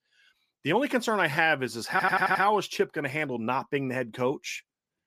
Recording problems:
audio stuttering; at 2 s

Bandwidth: 14.5 kHz